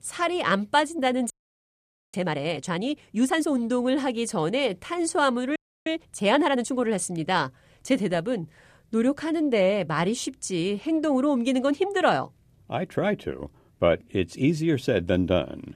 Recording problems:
audio freezing; at 1.5 s for 1 s and at 5.5 s

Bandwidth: 14.5 kHz